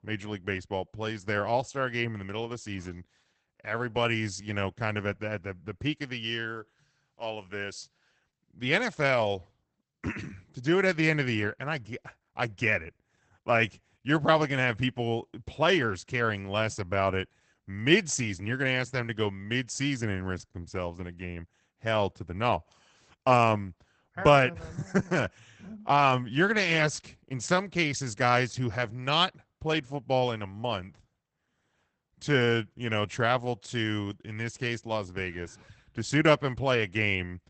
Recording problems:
garbled, watery; badly; nothing above 8 kHz

